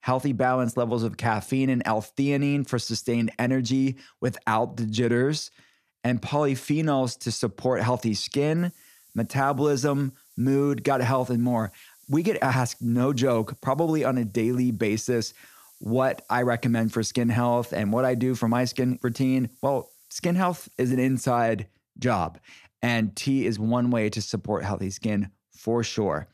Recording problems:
hiss; faint; from 8.5 to 21 s; 25 dB below the speech

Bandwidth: 14.5 kHz